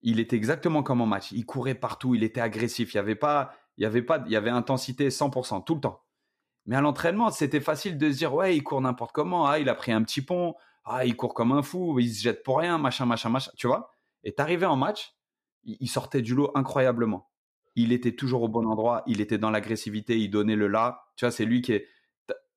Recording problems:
none

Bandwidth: 14.5 kHz